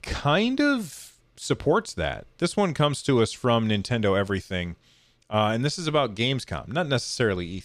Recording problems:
none

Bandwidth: 14.5 kHz